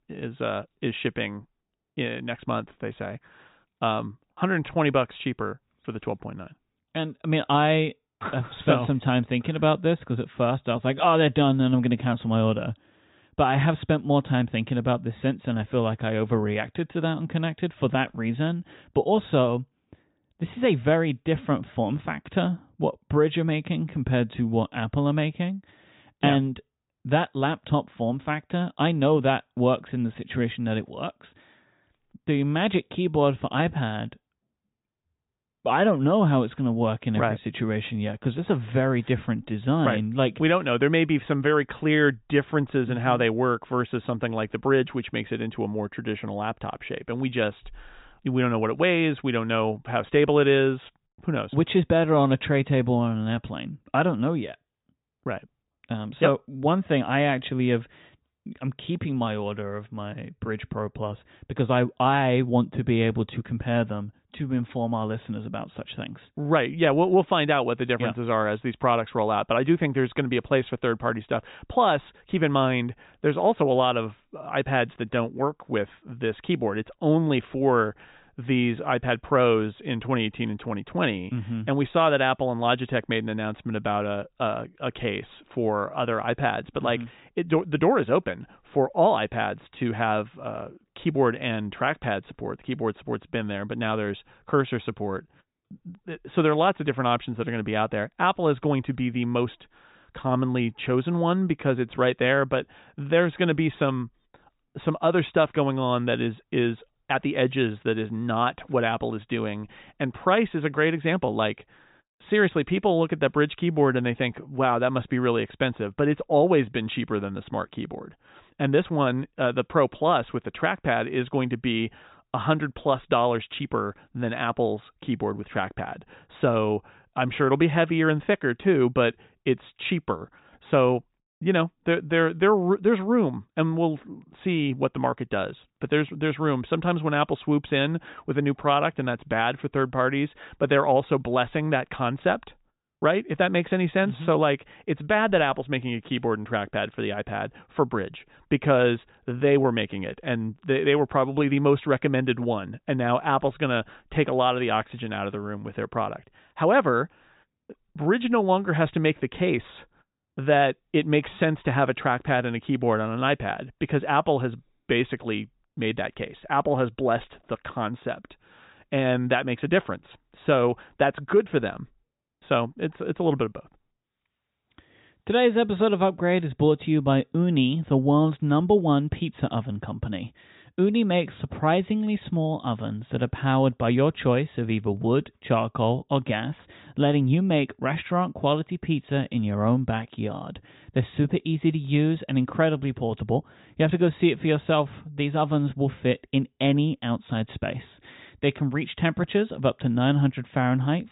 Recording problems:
high frequencies cut off; severe; nothing above 4 kHz

